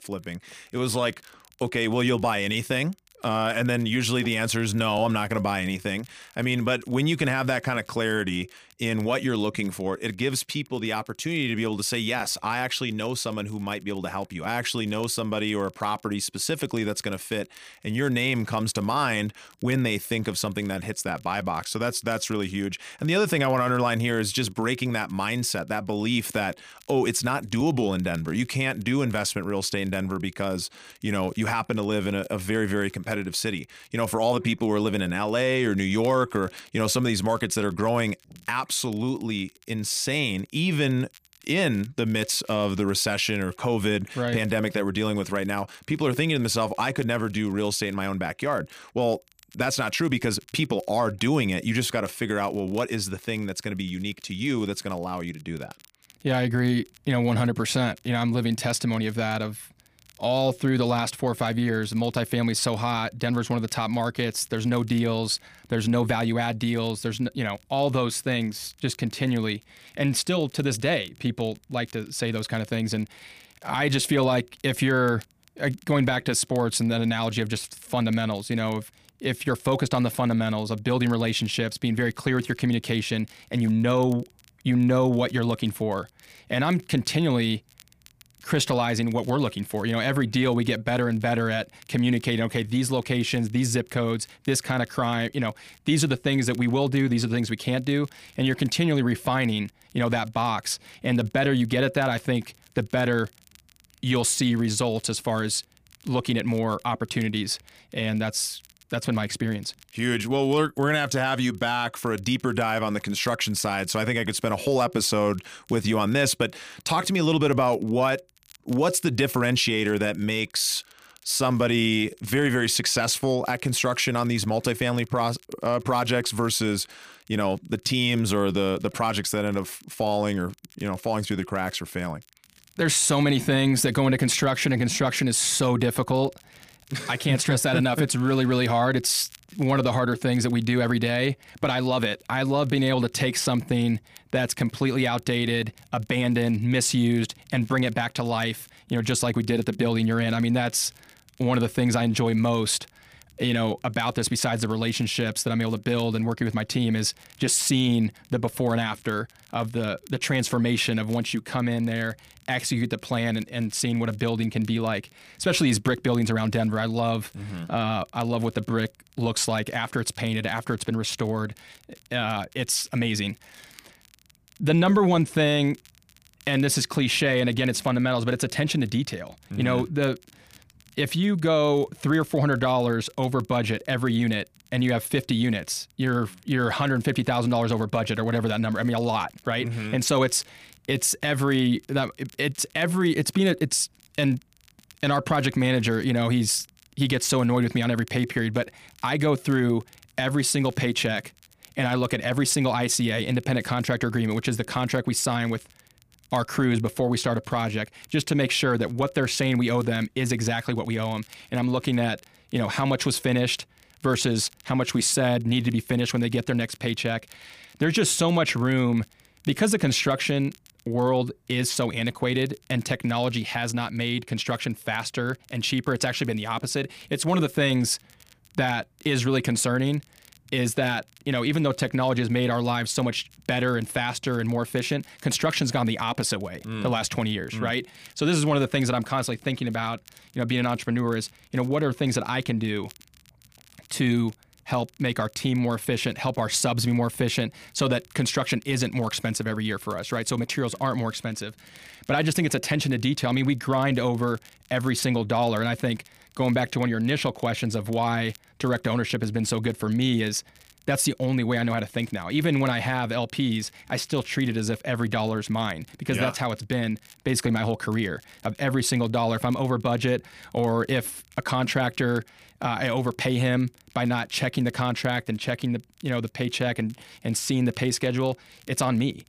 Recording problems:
crackle, like an old record; faint; 30 dB below the speech

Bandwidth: 15 kHz